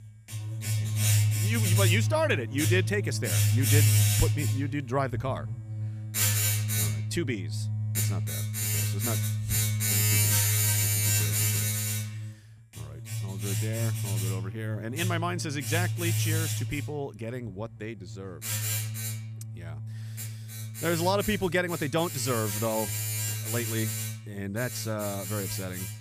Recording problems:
household noises; very loud; throughout; 4 dB above the speech

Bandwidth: 15 kHz